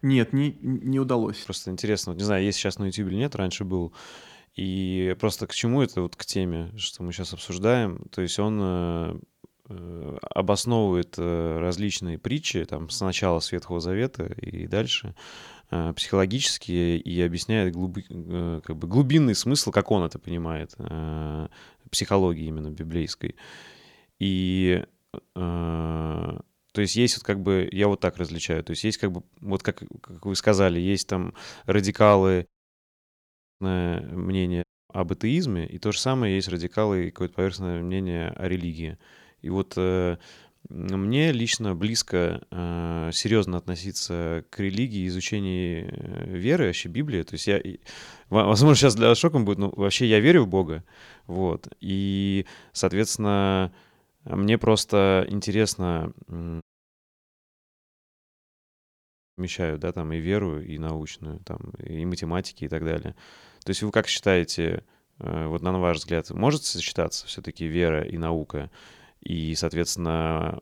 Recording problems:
audio cutting out; at 32 s for 1 s, at 35 s and at 57 s for 3 s

